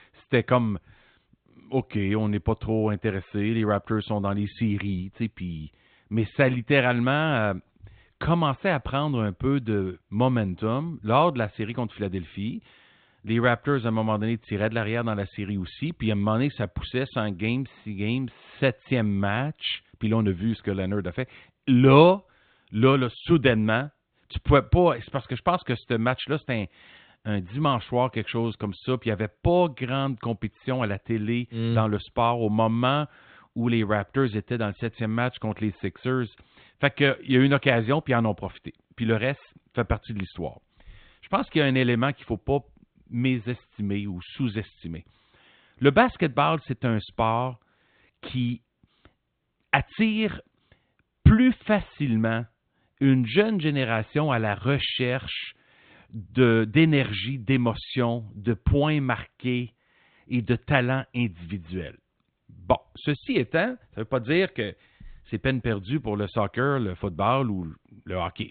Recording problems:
high frequencies cut off; severe; nothing above 4 kHz

